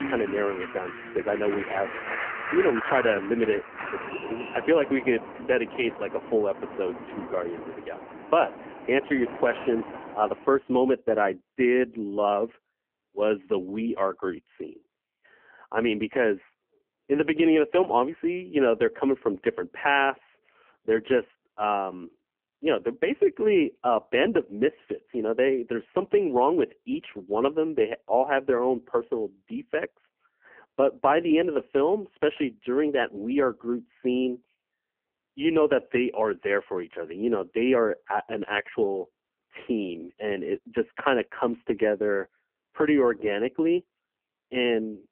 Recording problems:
phone-call audio; poor line; nothing above 3 kHz
traffic noise; noticeable; until 10 s; 10 dB below the speech

